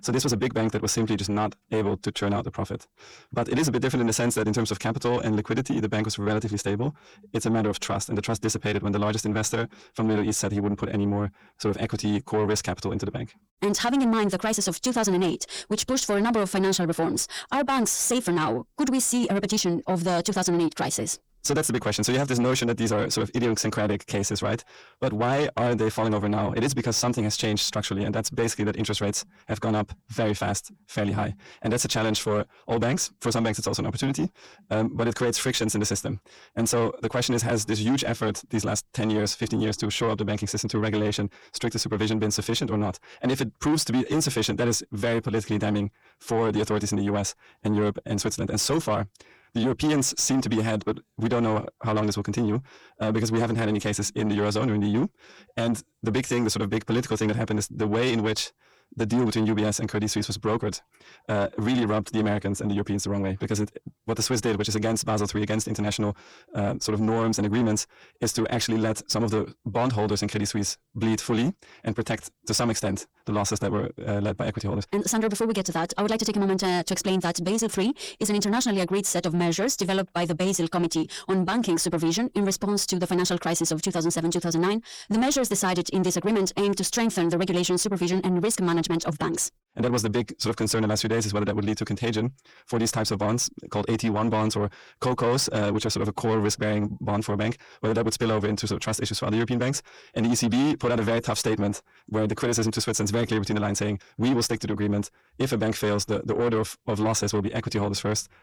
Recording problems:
wrong speed, natural pitch; too fast; 1.6 times normal speed
distortion; slight; 10 dB below the speech

